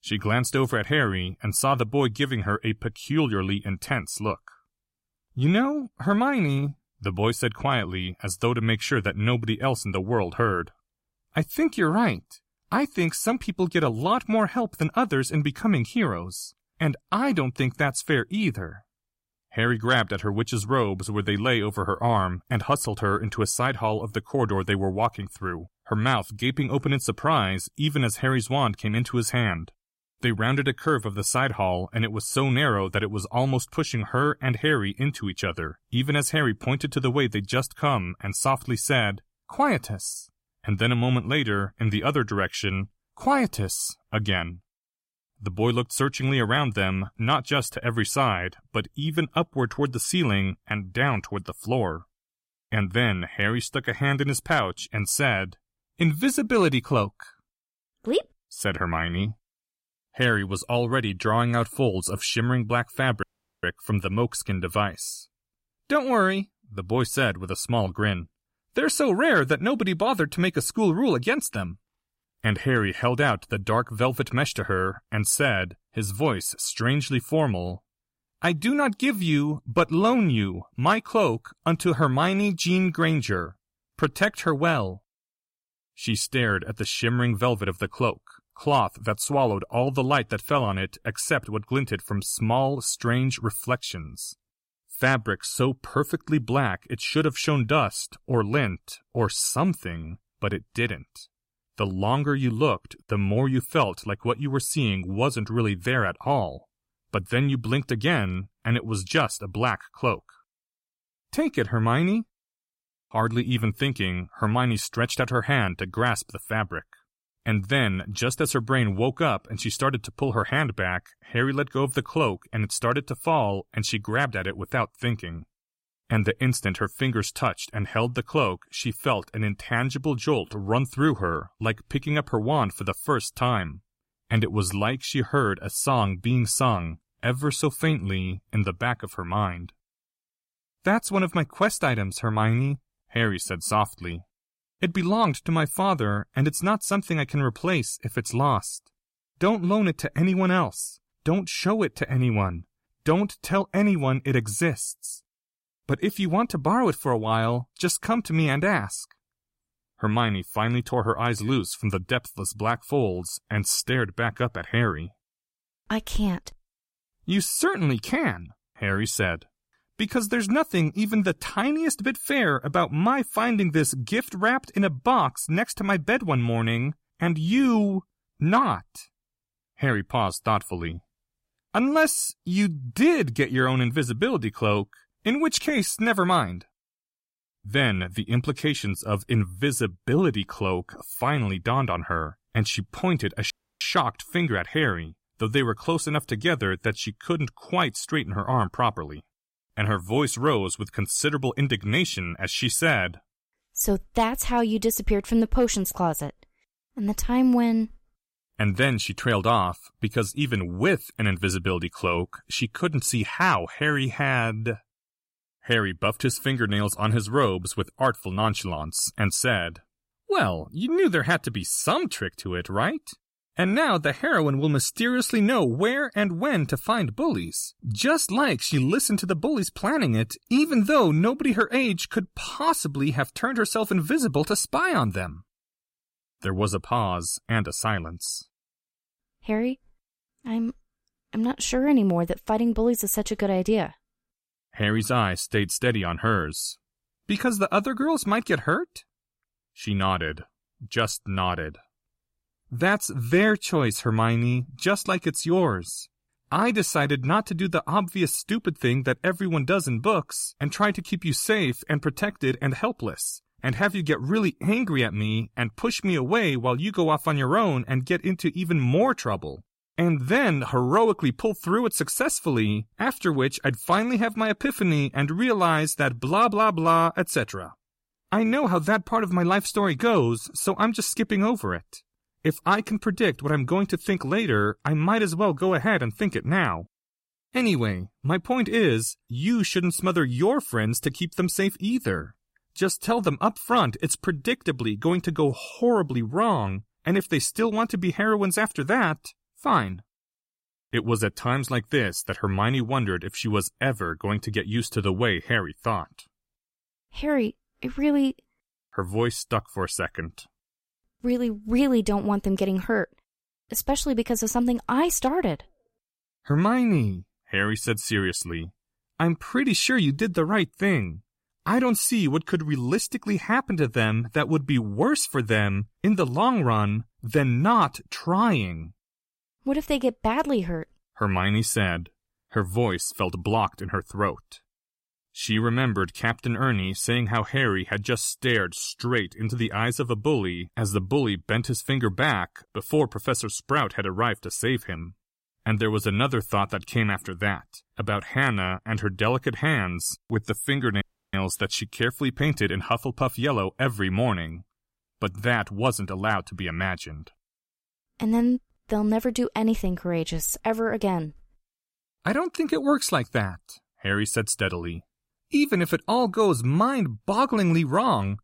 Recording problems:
audio cutting out; at 1:03, at 3:14 and at 5:51

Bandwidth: 16 kHz